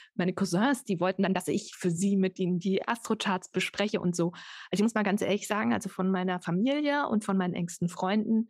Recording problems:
uneven, jittery; strongly; from 1 to 6.5 s

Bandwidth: 15.5 kHz